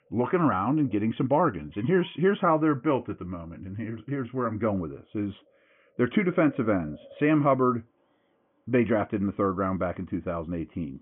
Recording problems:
high frequencies cut off; severe; nothing above 3 kHz
animal sounds; faint; throughout; 25 dB below the speech

